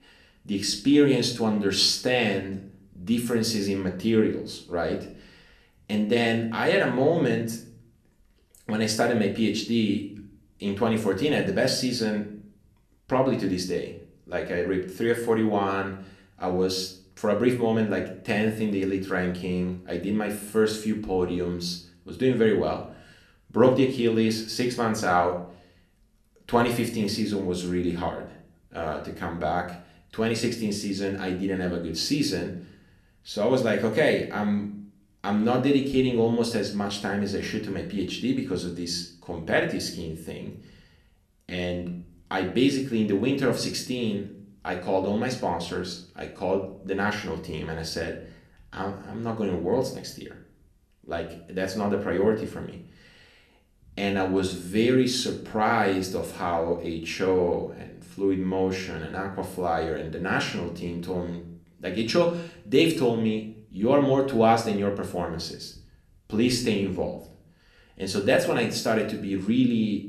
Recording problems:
room echo; slight; dies away in 0.5 s
off-mic speech; somewhat distant

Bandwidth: 13.5 kHz